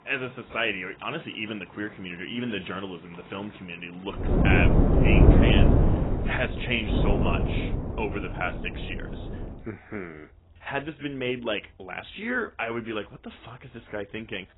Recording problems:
garbled, watery; badly; nothing above 3 kHz
wind noise on the microphone; heavy; from 4 to 9.5 s; 1 dB above the speech
rain or running water; faint; throughout; 20 dB below the speech

